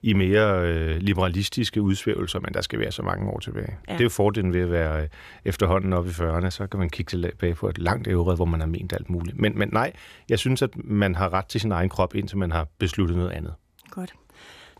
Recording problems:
none

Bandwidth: 14.5 kHz